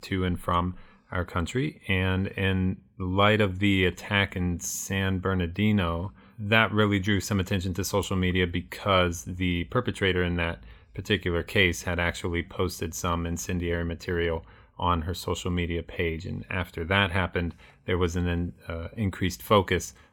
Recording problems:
none

